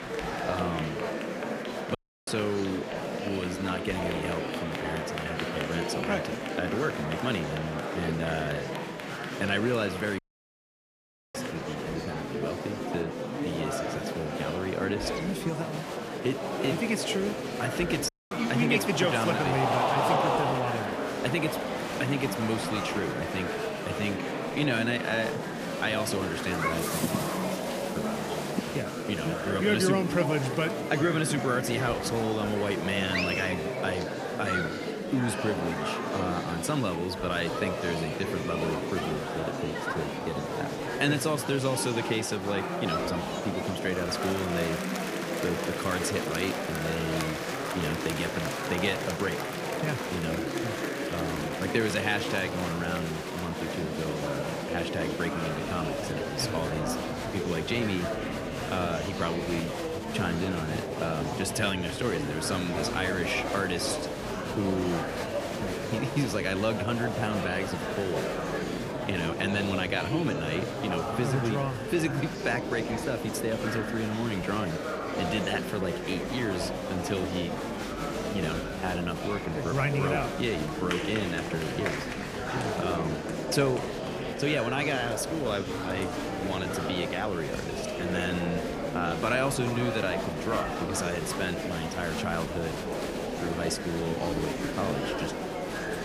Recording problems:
murmuring crowd; loud; throughout; 1 dB below the speech
audio cutting out; at 2 s, at 10 s for 1 s and at 18 s

